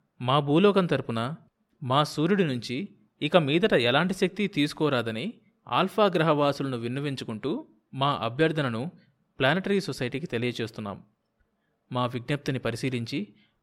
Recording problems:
none

